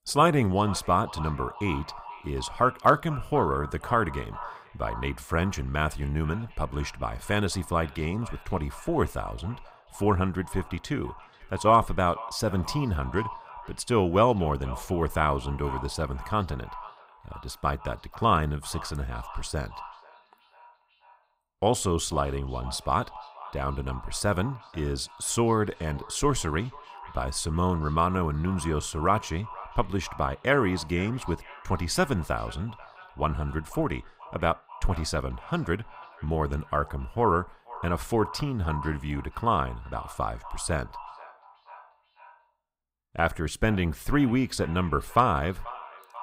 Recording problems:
echo of what is said; noticeable; throughout; 490 ms later, 15 dB below the speech

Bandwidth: 15.5 kHz